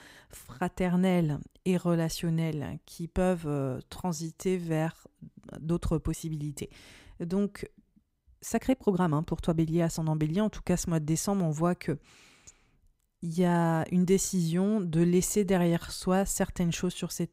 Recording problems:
uneven, jittery; strongly; from 4 to 16 s

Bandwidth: 15.5 kHz